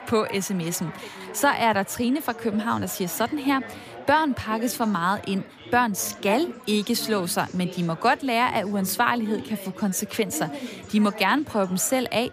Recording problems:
chatter from many people; noticeable; throughout; 15 dB below the speech

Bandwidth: 15 kHz